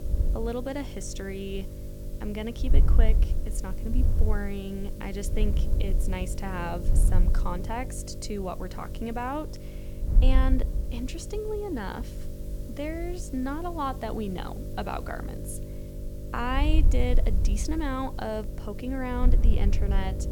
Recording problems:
electrical hum; noticeable; throughout; 50 Hz, 10 dB below the speech
wind noise on the microphone; occasional gusts; 10 dB below the speech
hiss; noticeable; throughout; 20 dB below the speech

